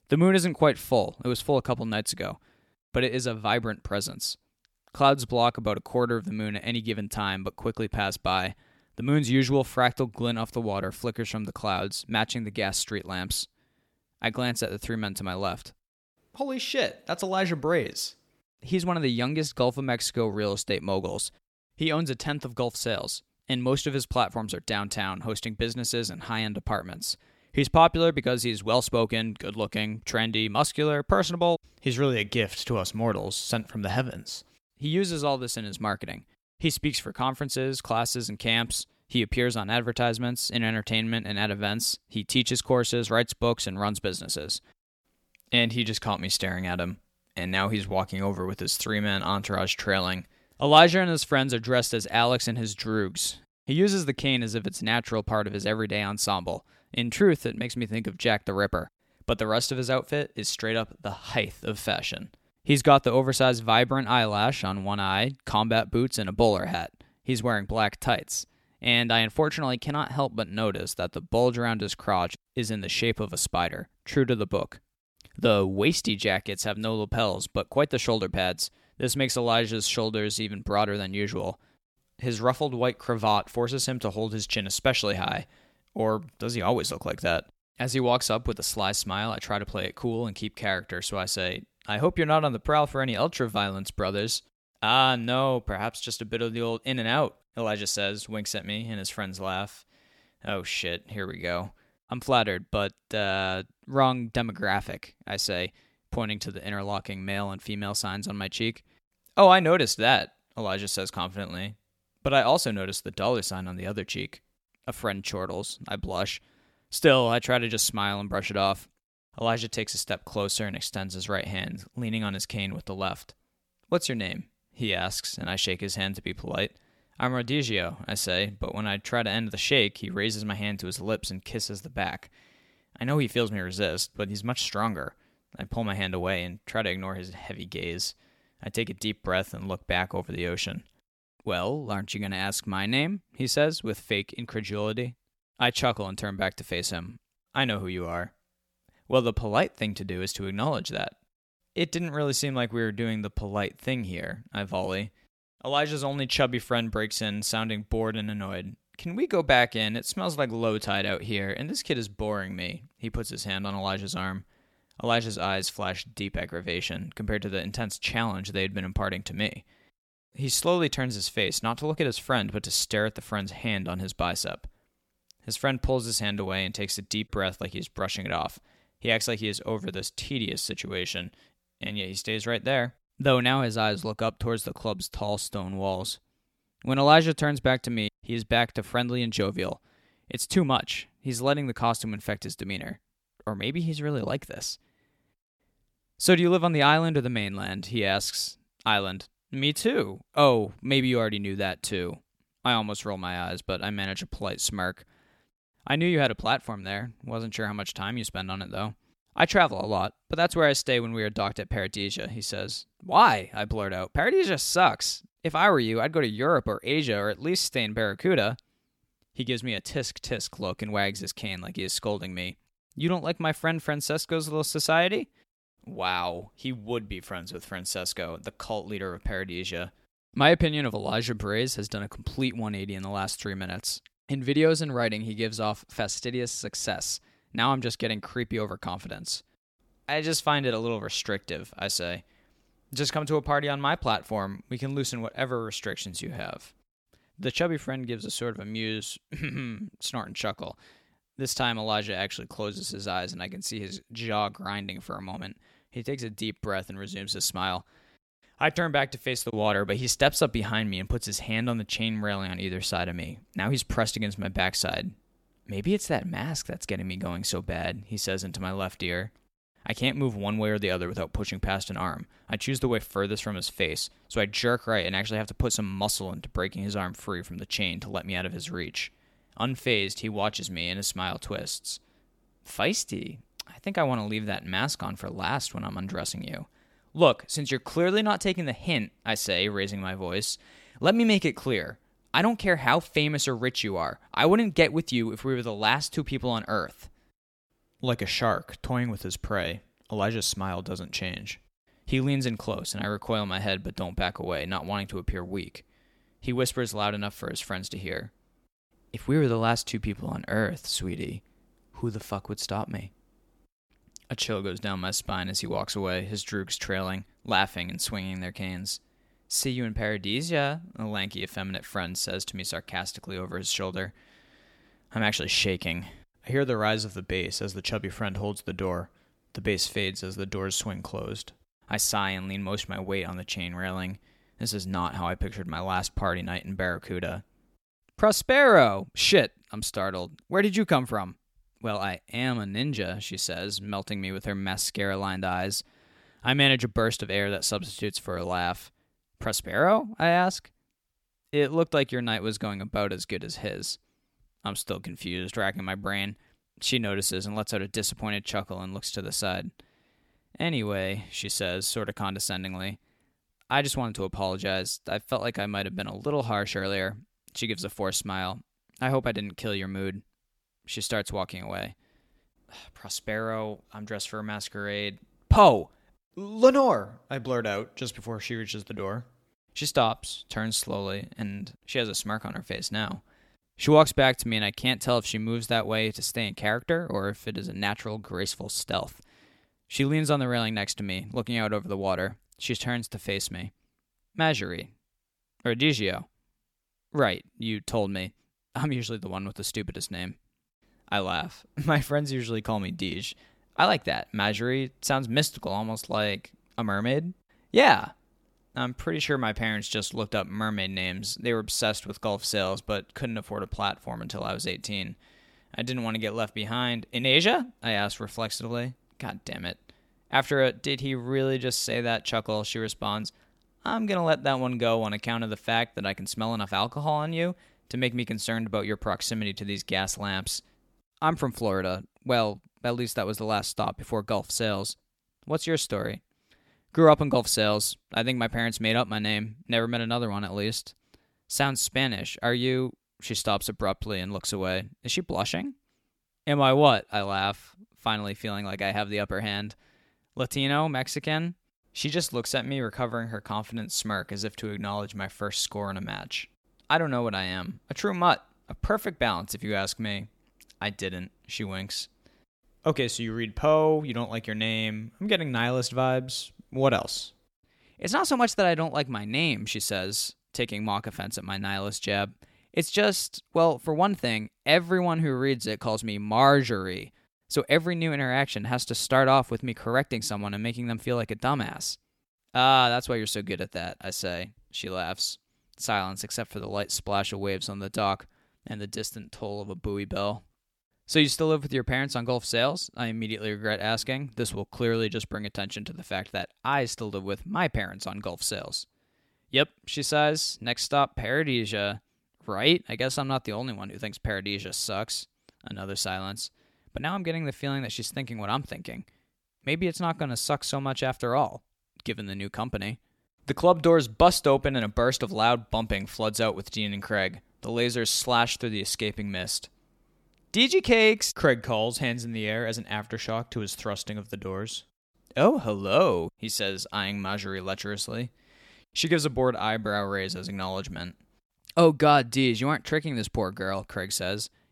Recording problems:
none

